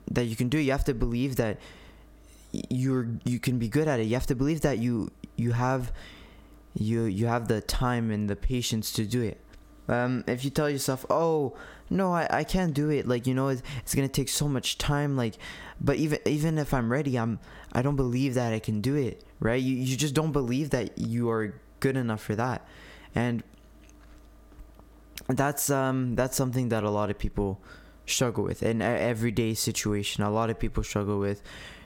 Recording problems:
squashed, flat; heavily

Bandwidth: 16.5 kHz